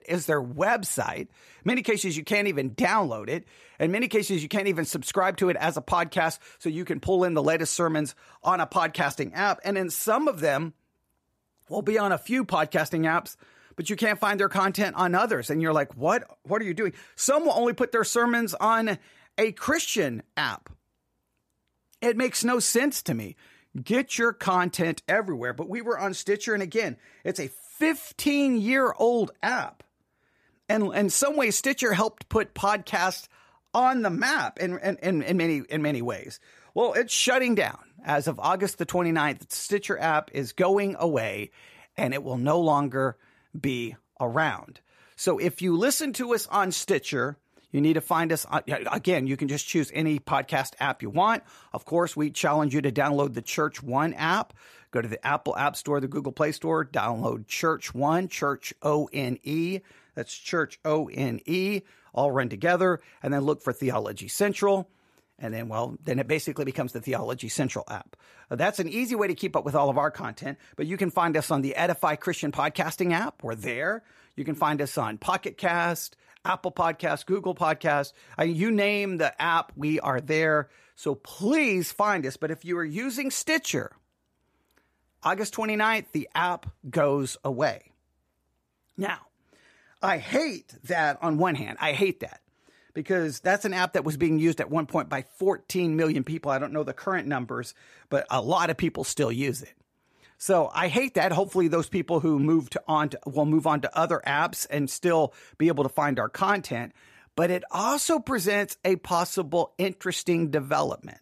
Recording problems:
none

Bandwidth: 15 kHz